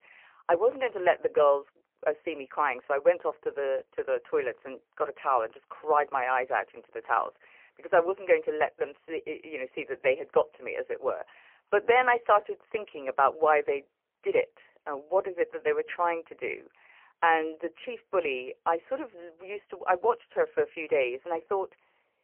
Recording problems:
phone-call audio; poor line; nothing above 3 kHz

